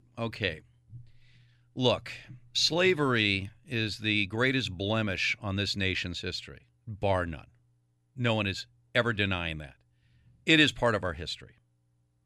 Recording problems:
none

